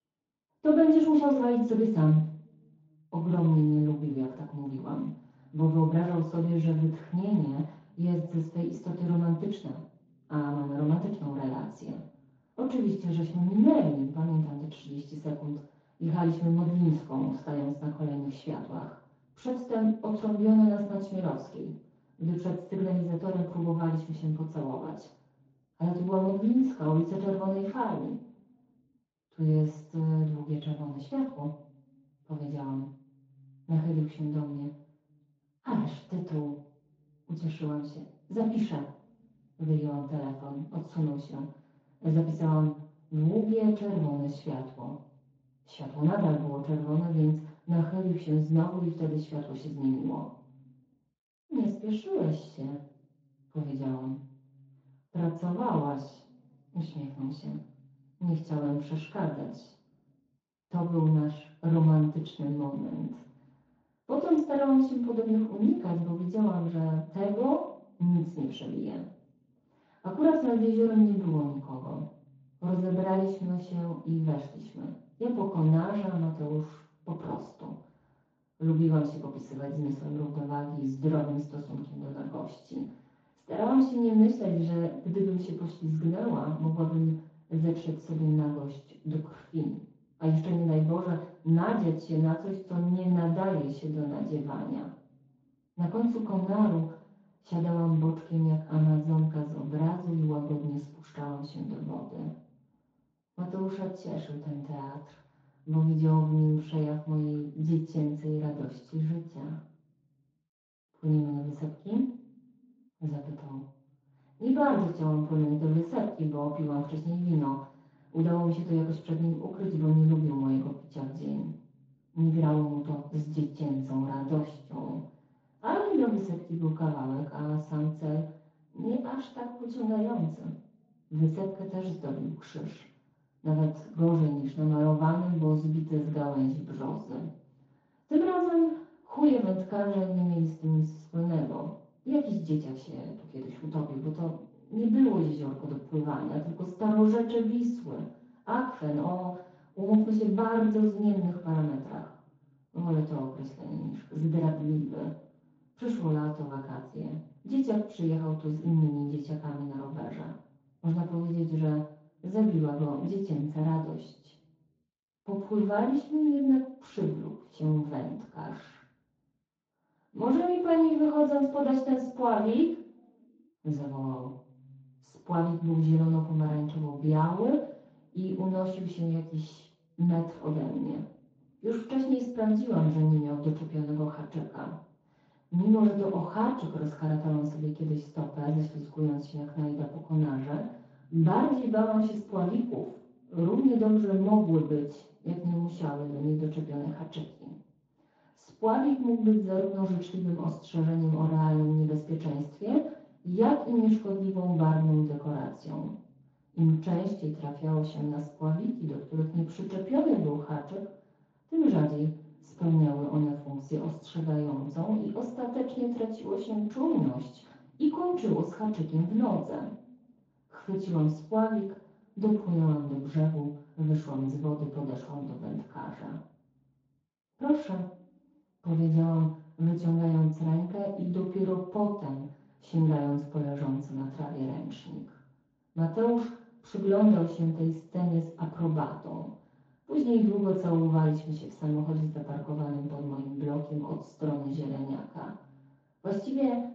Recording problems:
off-mic speech; far
room echo; noticeable; dies away in 0.6 s
garbled, watery; slightly

